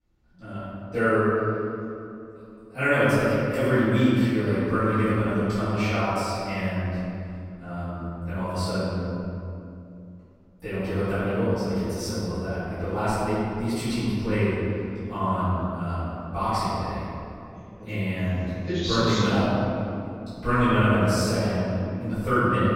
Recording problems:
room echo; strong; dies away in 2.5 s
off-mic speech; far

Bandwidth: 16 kHz